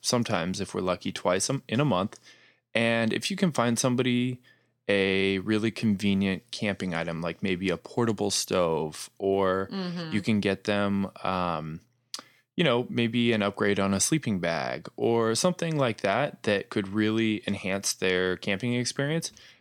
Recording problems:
none

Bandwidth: 18.5 kHz